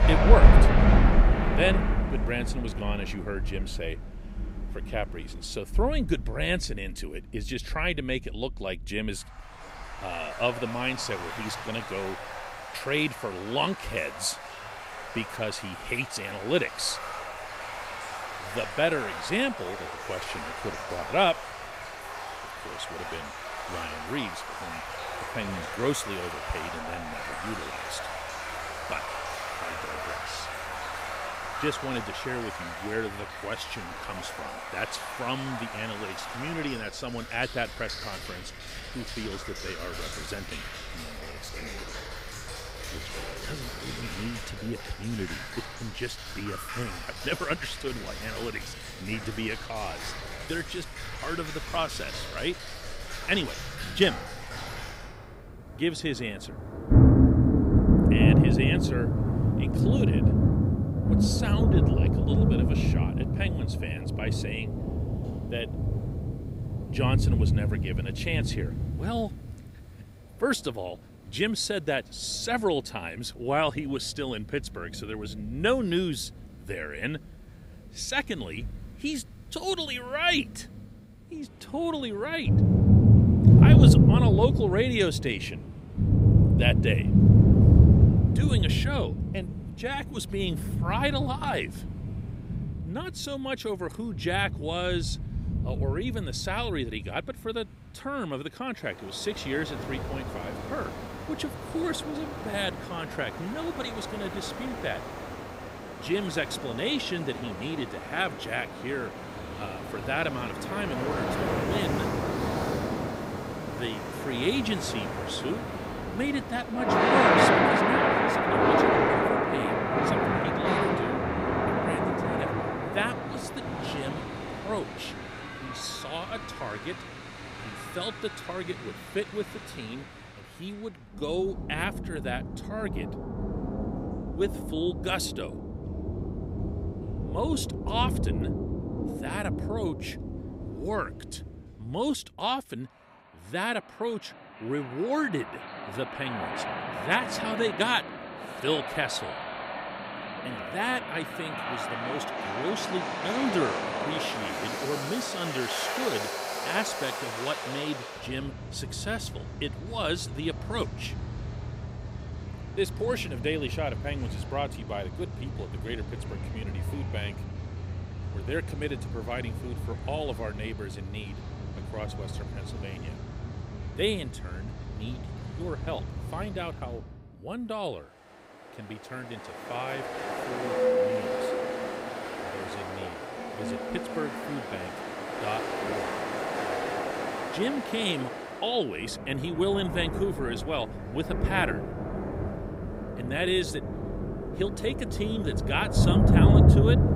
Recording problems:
rain or running water; very loud; throughout; 4 dB above the speech

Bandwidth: 15.5 kHz